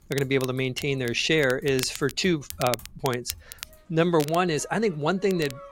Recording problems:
crackle, like an old record; noticeable; 15 dB below the speech
household noises; faint; throughout; 25 dB below the speech

